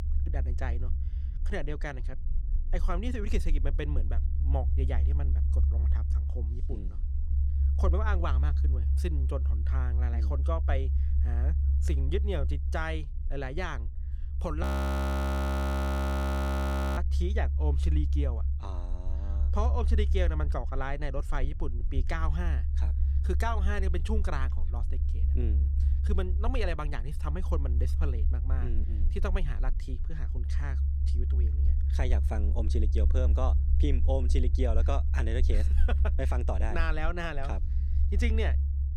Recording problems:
low rumble; loud; throughout; 9 dB below the speech
audio freezing; at 15 s for 2.5 s

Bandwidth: 18.5 kHz